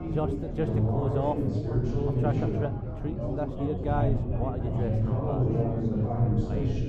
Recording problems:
muffled; very; fading above 1.5 kHz
chatter from many people; very loud; throughout; 6 dB above the speech
wind noise on the microphone; occasional gusts; 20 dB below the speech
animal sounds; very faint; throughout; 45 dB below the speech

